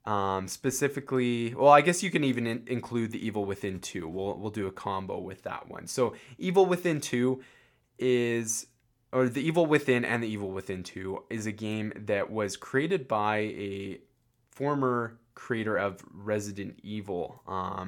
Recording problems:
abrupt cut into speech; at the end

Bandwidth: 18 kHz